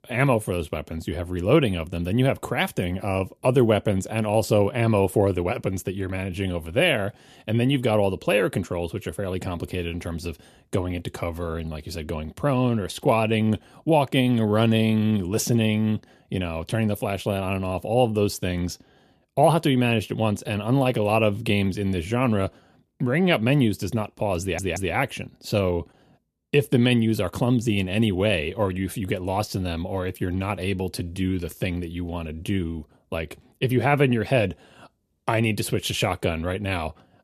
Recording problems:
audio stuttering; at 24 s

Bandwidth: 14.5 kHz